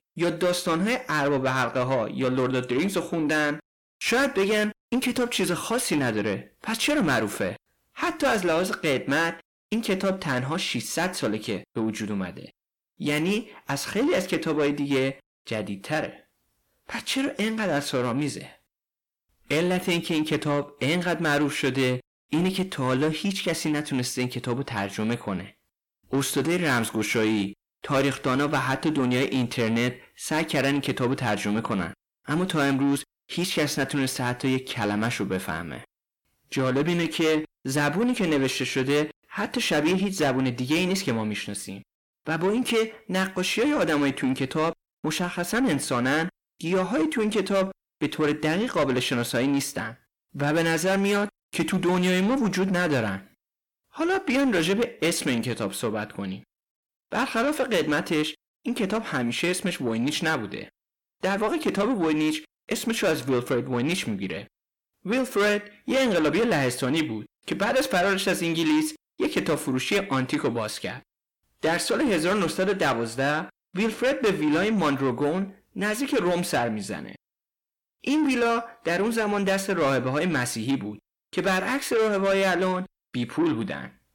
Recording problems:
distortion; heavy; 8 dB below the speech

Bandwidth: 17.5 kHz